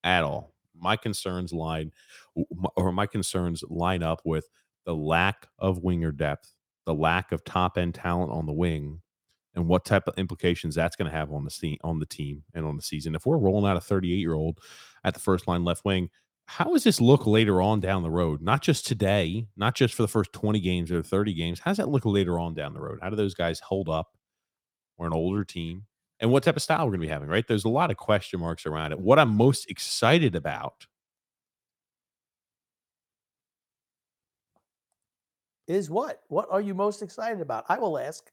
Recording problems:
none

